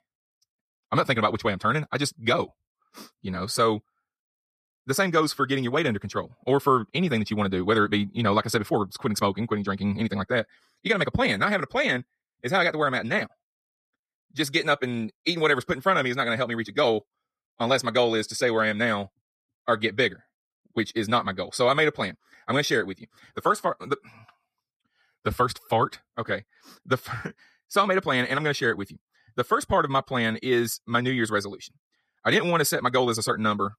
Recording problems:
wrong speed, natural pitch; too fast; 1.5 times normal speed

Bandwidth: 14.5 kHz